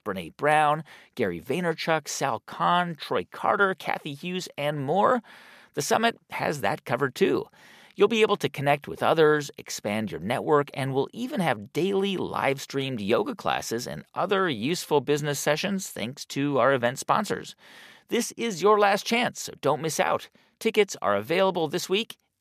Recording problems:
none

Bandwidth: 14.5 kHz